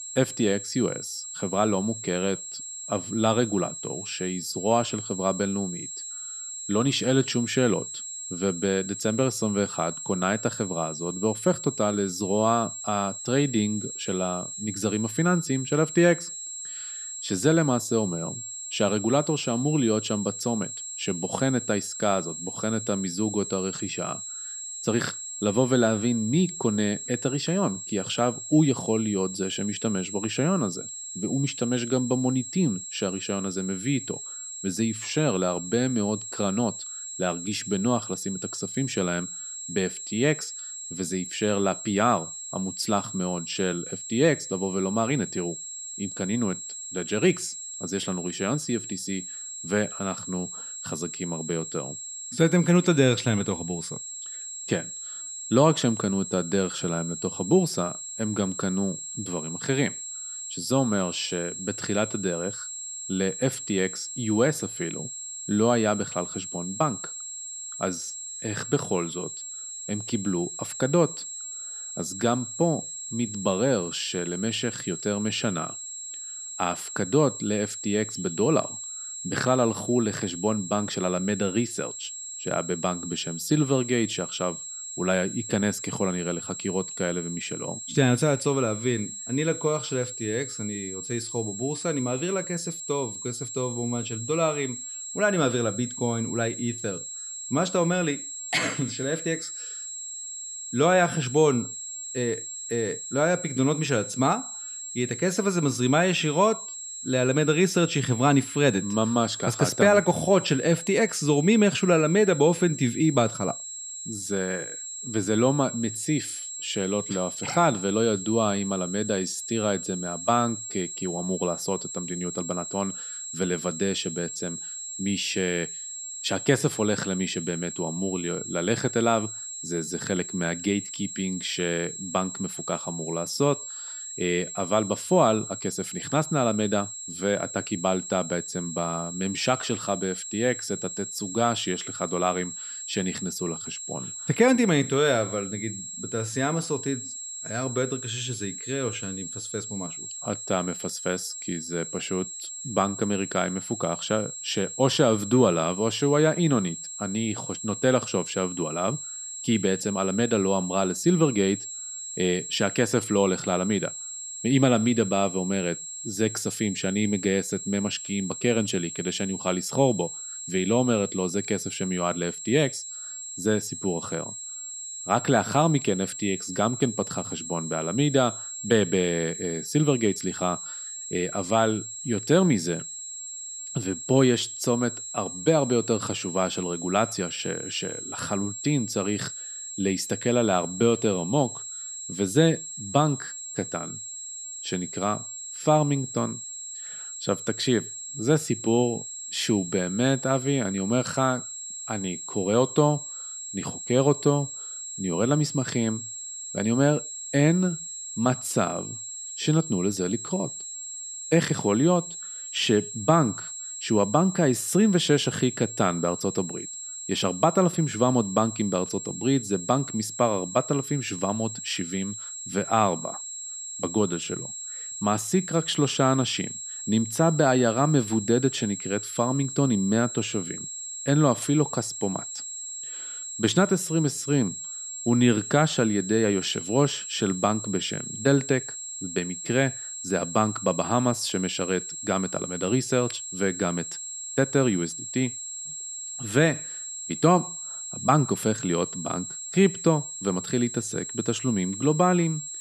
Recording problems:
high-pitched whine; loud; throughout; 7.5 kHz, 8 dB below the speech

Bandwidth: 13.5 kHz